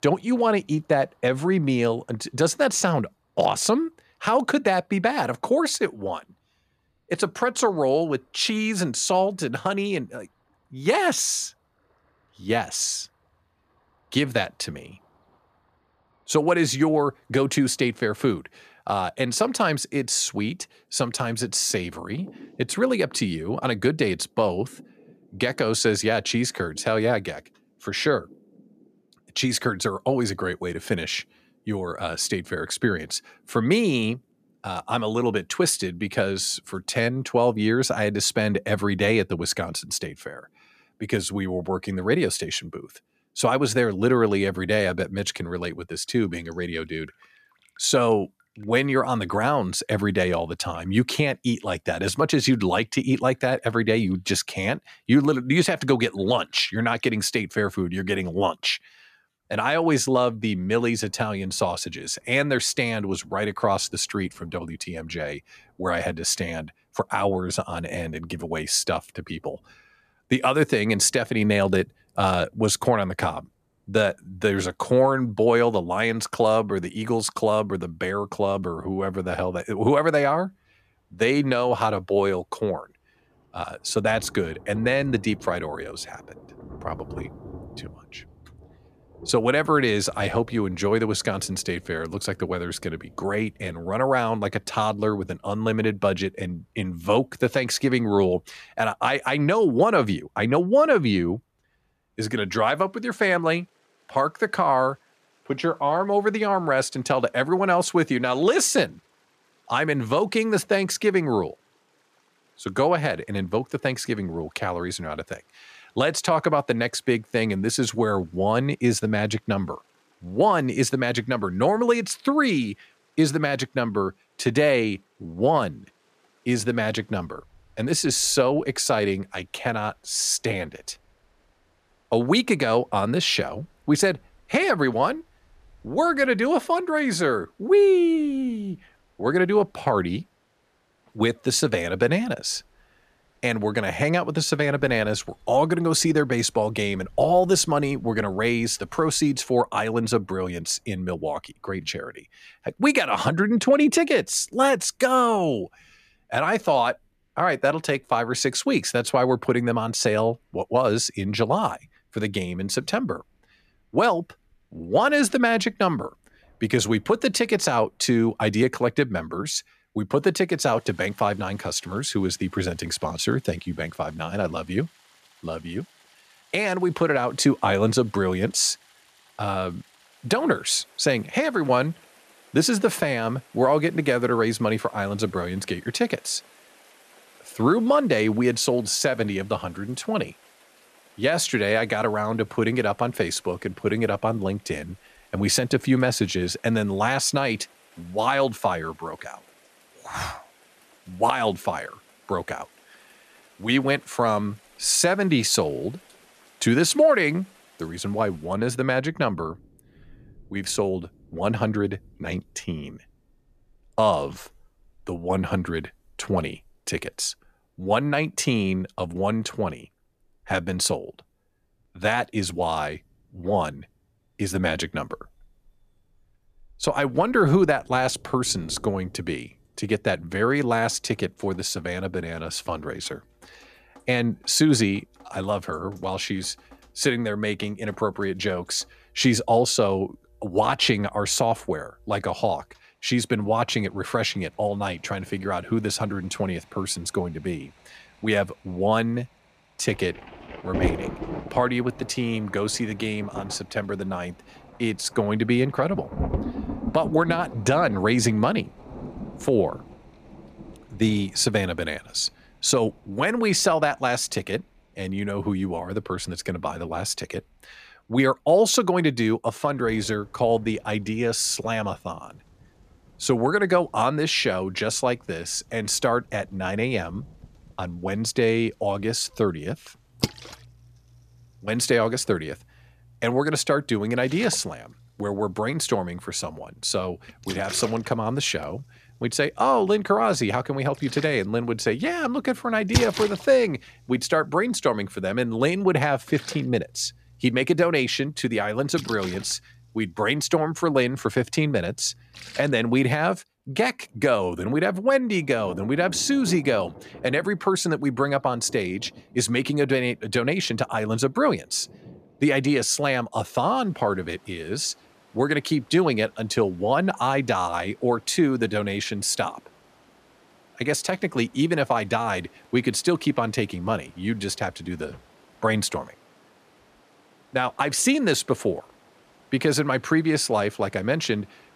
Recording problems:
rain or running water; noticeable; throughout; 20 dB below the speech

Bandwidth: 14.5 kHz